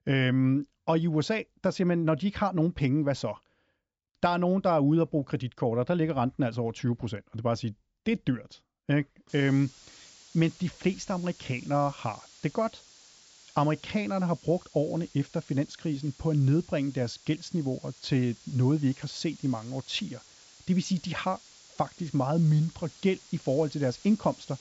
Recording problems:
high frequencies cut off; noticeable; nothing above 8 kHz
hiss; faint; from 9.5 s on; 25 dB below the speech

